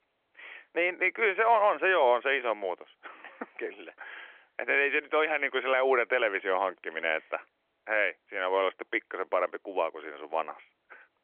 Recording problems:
phone-call audio; nothing above 3.5 kHz

